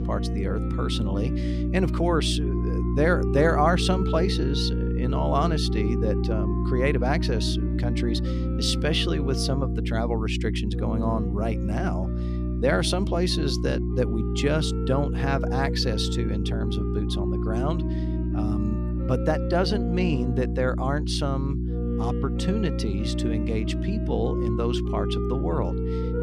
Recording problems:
electrical hum; loud; throughout; 60 Hz, 9 dB below the speech
background music; loud; throughout; 8 dB below the speech

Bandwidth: 14.5 kHz